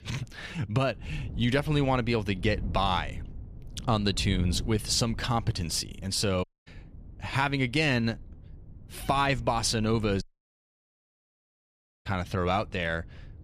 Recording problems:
wind noise on the microphone; occasional gusts; 25 dB below the speech
audio cutting out; at 6.5 s and at 10 s for 2 s

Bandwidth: 14.5 kHz